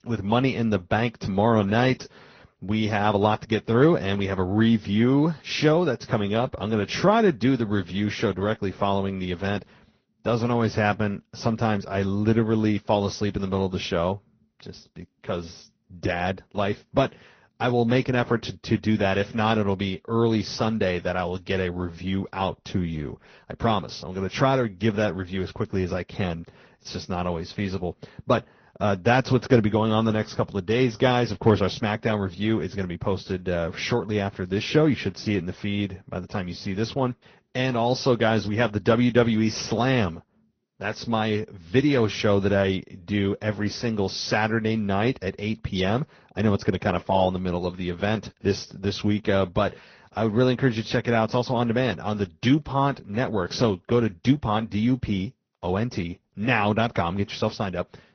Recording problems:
high frequencies cut off; noticeable; nothing above 6 kHz
garbled, watery; slightly

